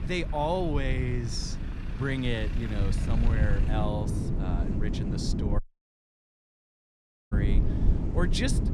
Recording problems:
wind noise on the microphone; heavy; 8 dB below the speech
traffic noise; noticeable; throughout; 15 dB below the speech
low rumble; noticeable; throughout; 15 dB below the speech
audio cutting out; at 5.5 s for 1.5 s

